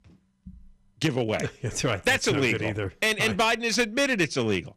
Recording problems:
distortion; slight; 5% of the sound clipped

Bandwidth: 15 kHz